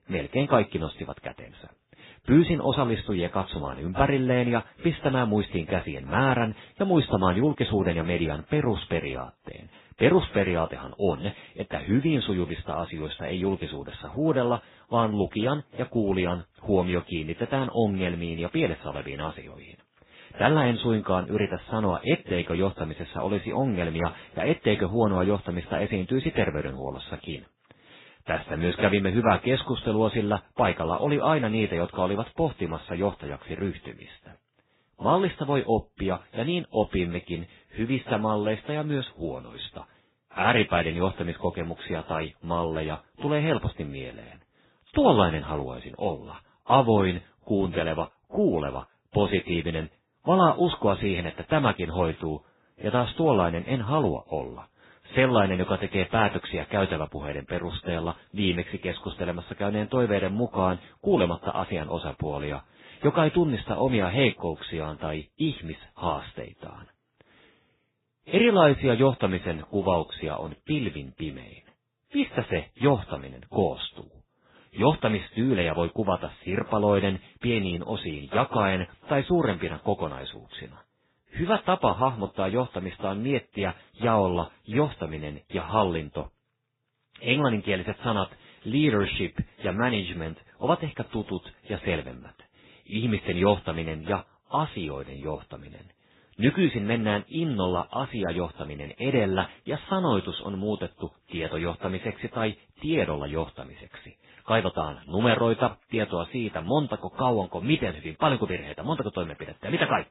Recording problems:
garbled, watery; badly; nothing above 4 kHz

